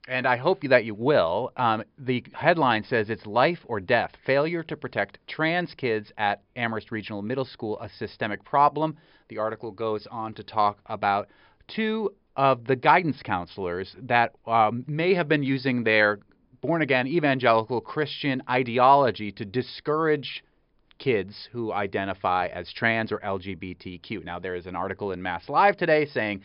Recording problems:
high frequencies cut off; noticeable; nothing above 5.5 kHz

